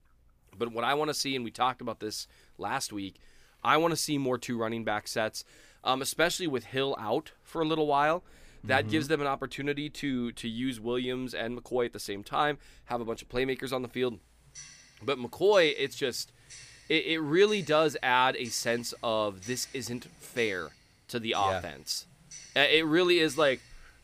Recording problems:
household noises; faint; throughout; 20 dB below the speech

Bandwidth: 15 kHz